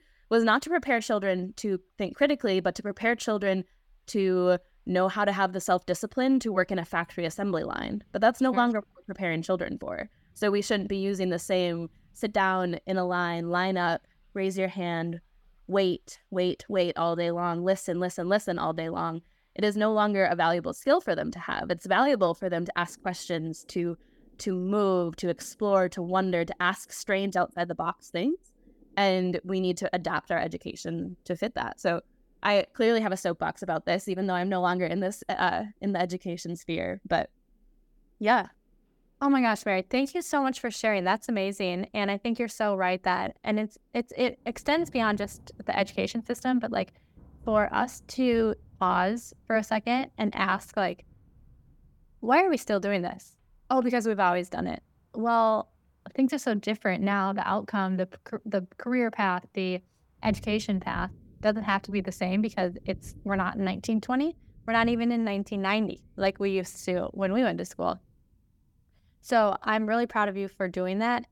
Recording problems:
rain or running water; faint; throughout; 25 dB below the speech

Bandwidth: 17.5 kHz